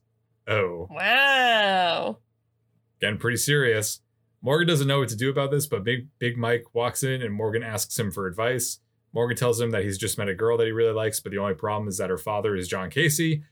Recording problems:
none

